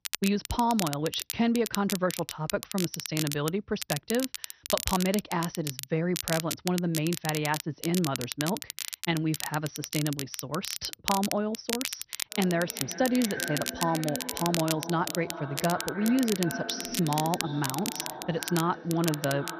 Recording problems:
echo of what is said; strong; from 12 s on; 370 ms later, 10 dB below the speech
garbled, watery; slightly; nothing above 6 kHz
crackle, like an old record; loud; 5 dB below the speech

